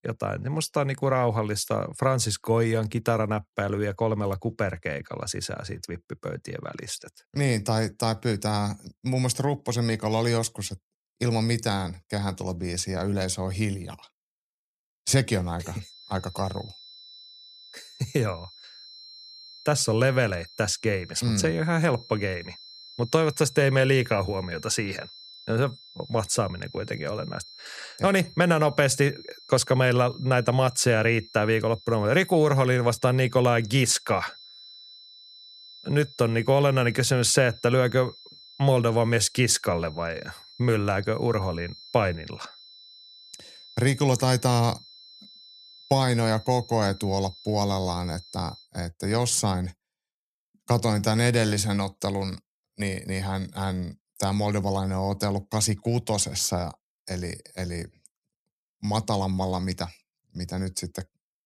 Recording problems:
high-pitched whine; noticeable; from 16 to 49 s; 4 kHz, 20 dB below the speech

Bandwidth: 13.5 kHz